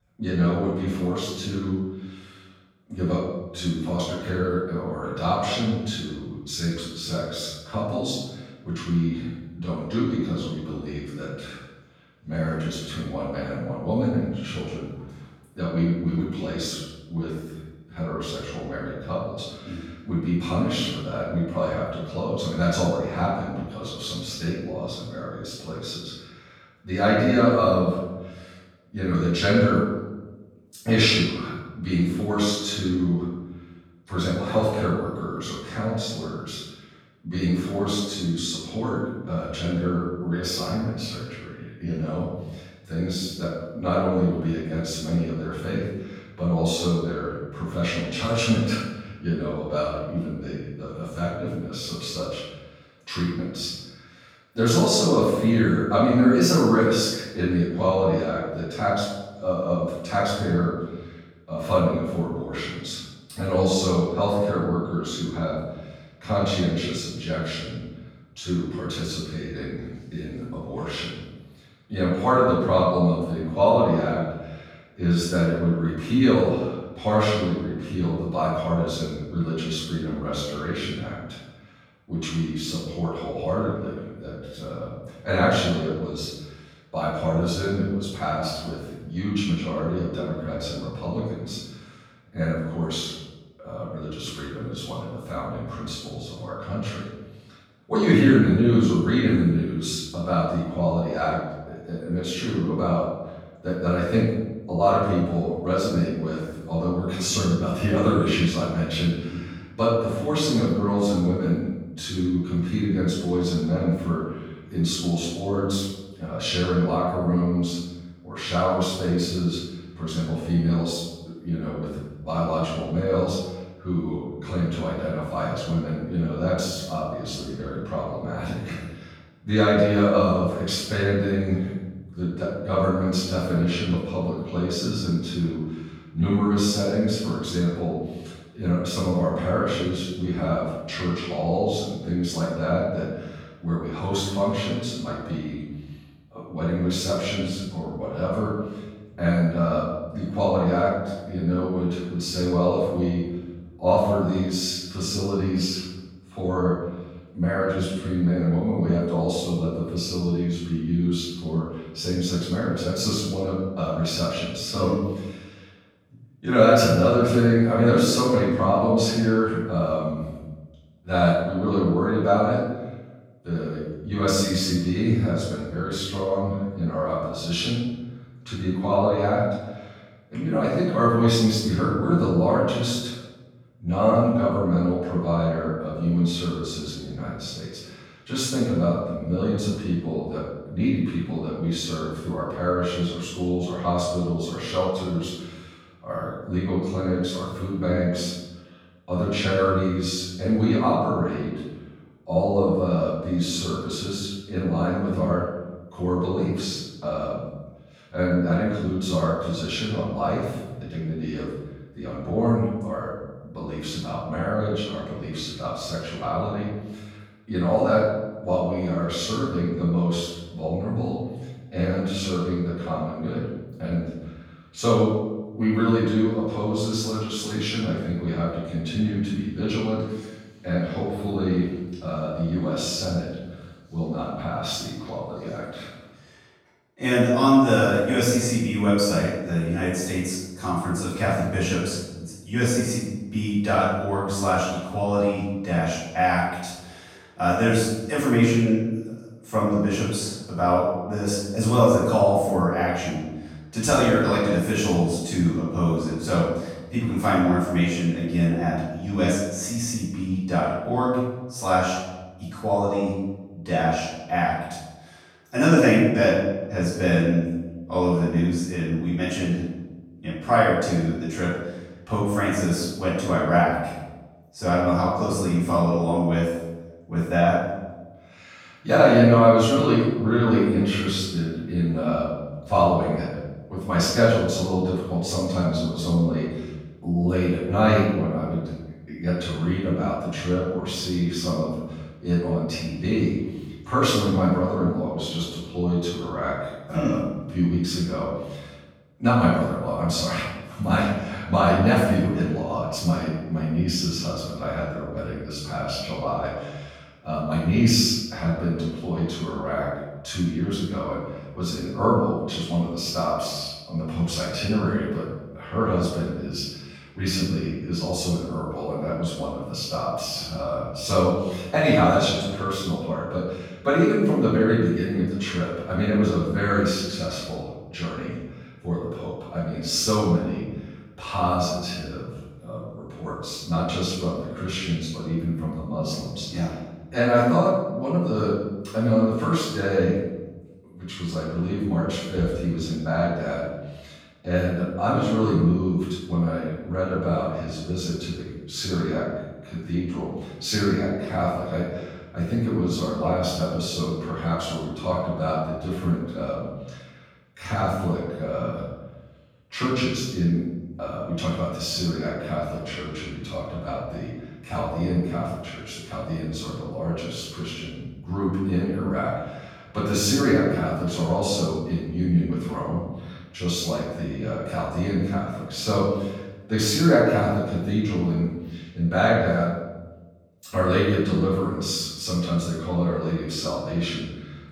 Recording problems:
room echo; strong; dies away in 1 s
off-mic speech; far

